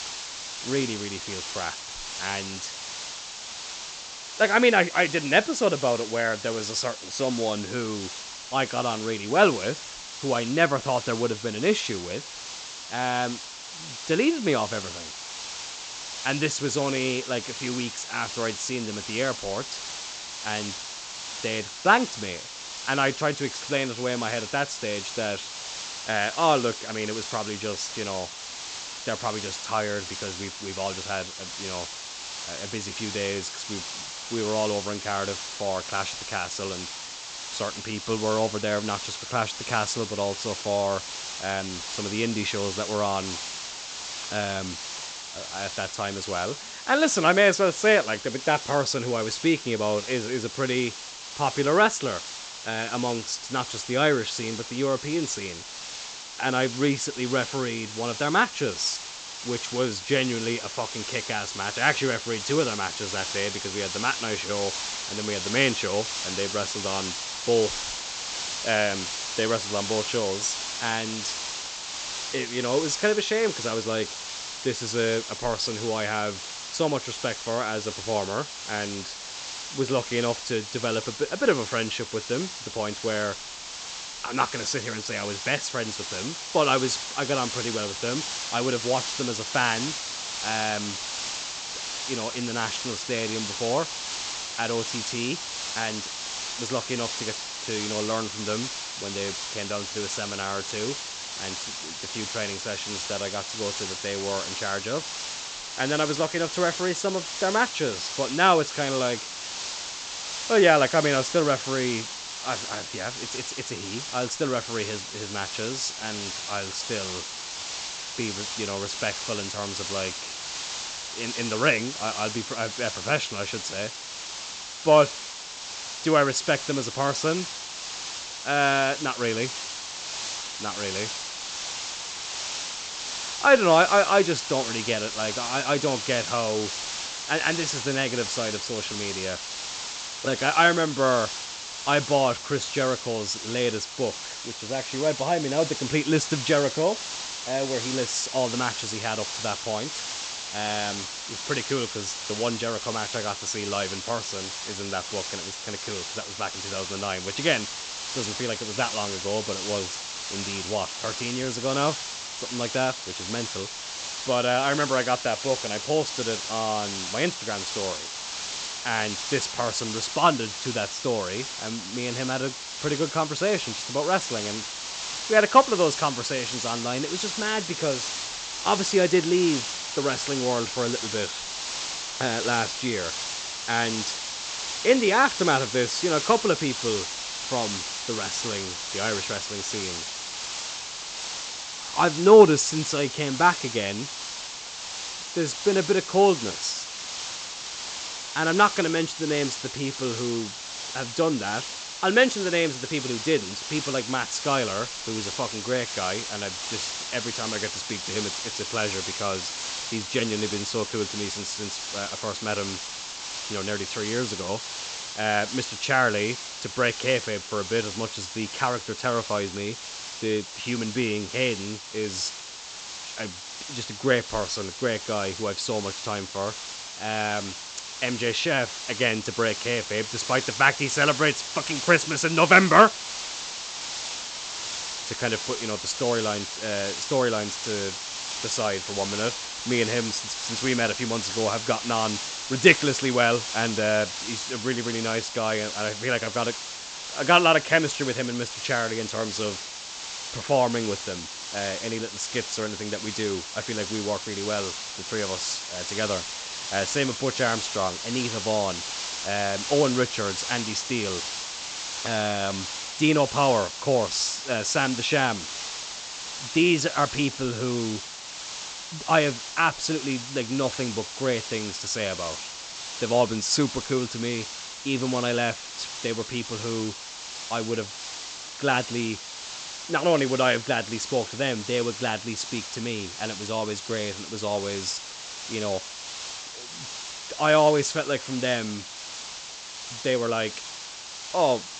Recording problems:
high frequencies cut off; noticeable; nothing above 8 kHz
hiss; loud; throughout; 6 dB below the speech

